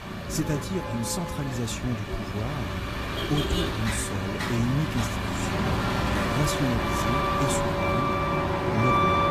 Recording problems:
garbled, watery; slightly; nothing above 14.5 kHz
traffic noise; very loud; throughout; 2 dB above the speech
wind noise on the microphone; heavy; 2 dB above the speech

